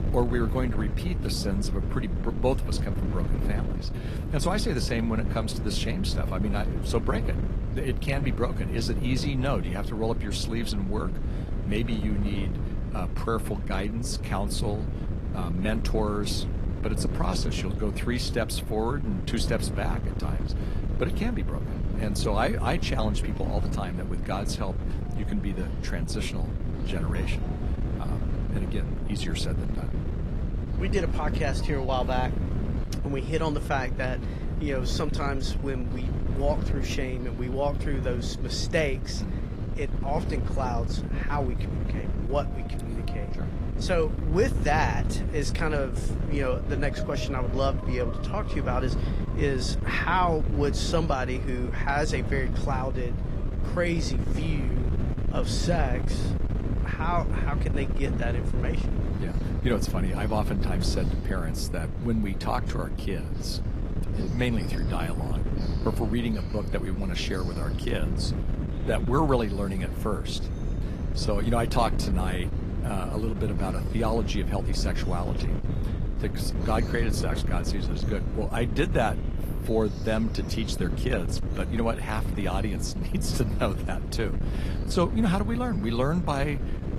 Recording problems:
garbled, watery; slightly; nothing above 12.5 kHz
wind noise on the microphone; heavy; 9 dB below the speech
animal sounds; faint; throughout; 20 dB below the speech

